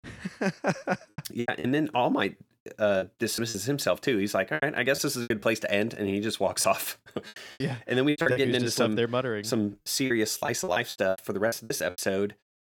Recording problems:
choppy; very; 12% of the speech affected

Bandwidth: 18.5 kHz